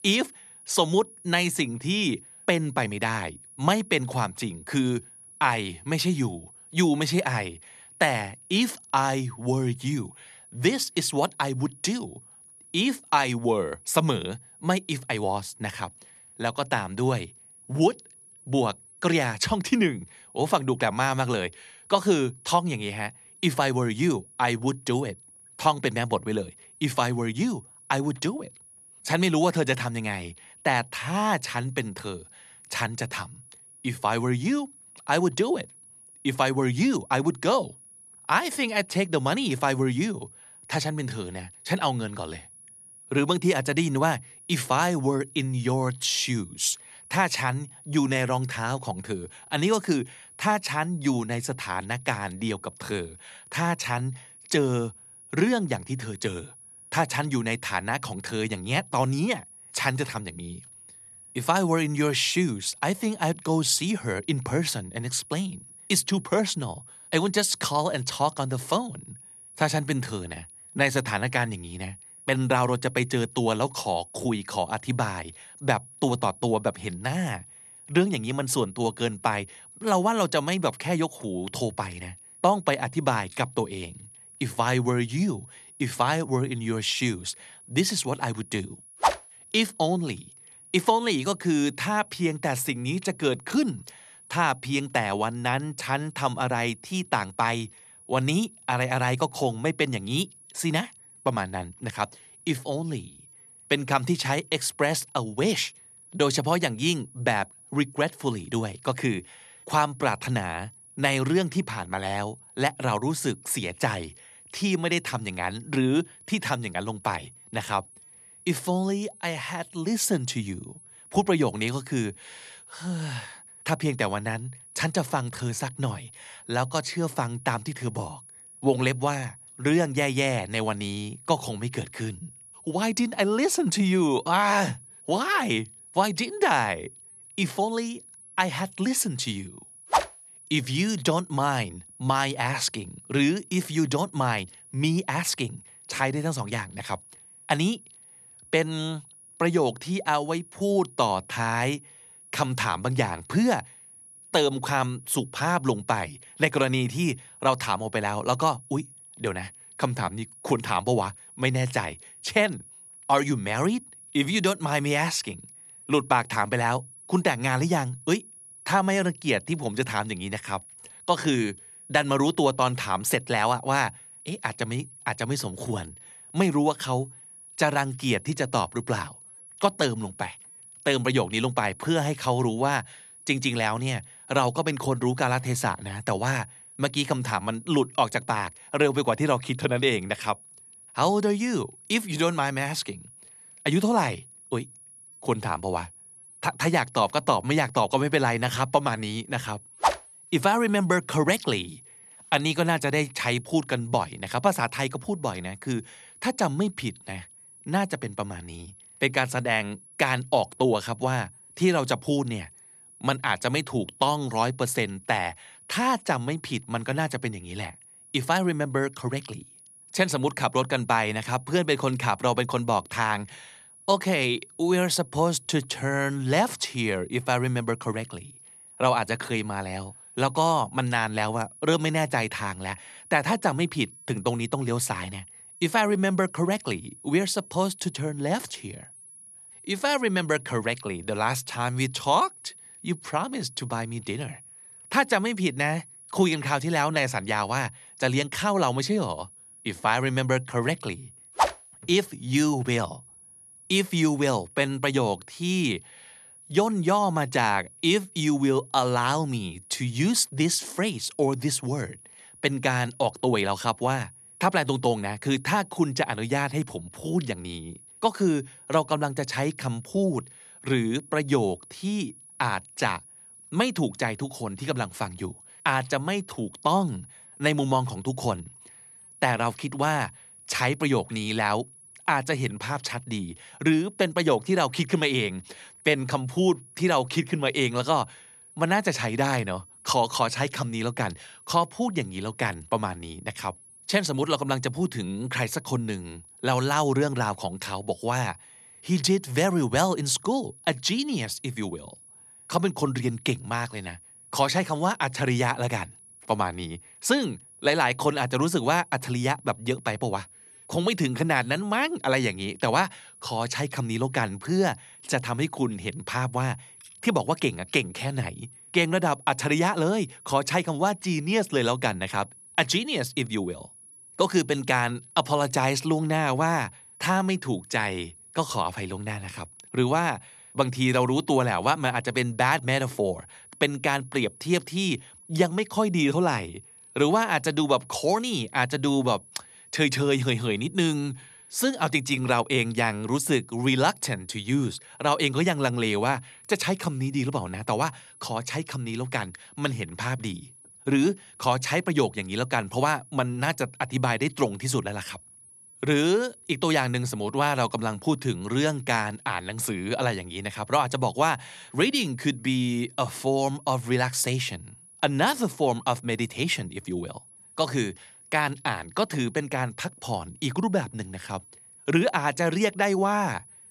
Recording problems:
high-pitched whine; faint; throughout; 10.5 kHz, 20 dB below the speech

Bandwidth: 13.5 kHz